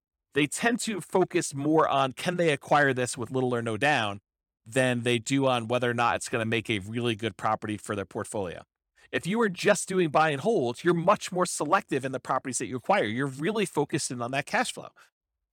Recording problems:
none

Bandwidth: 17 kHz